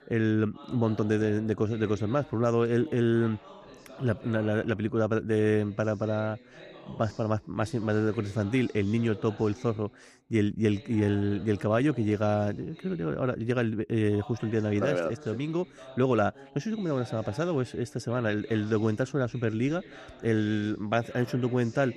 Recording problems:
voice in the background; faint; throughout; 20 dB below the speech

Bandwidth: 14 kHz